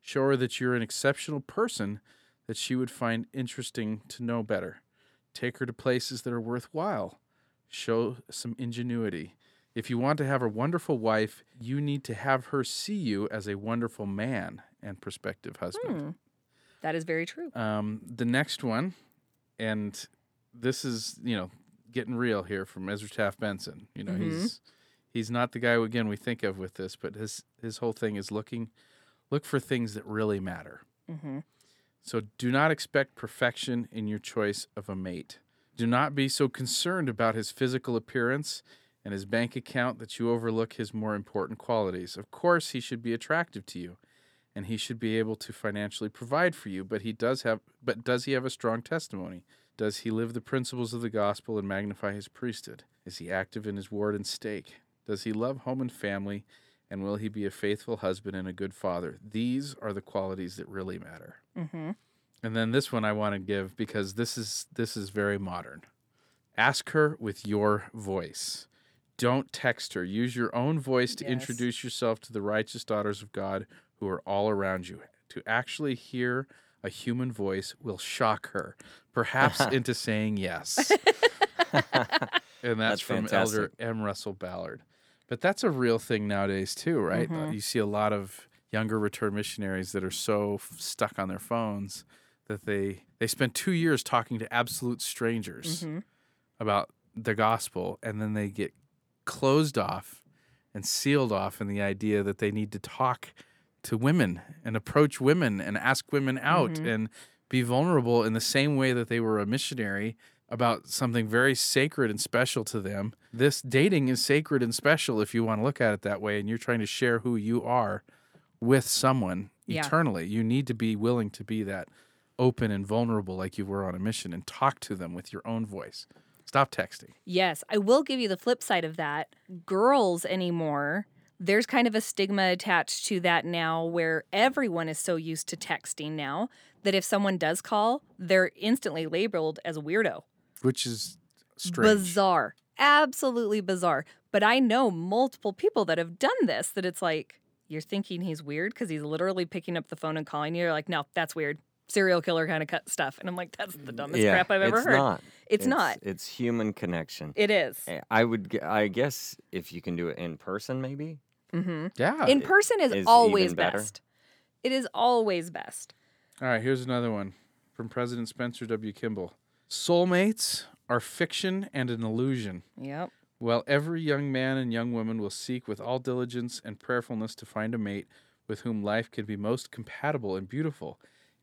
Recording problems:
none

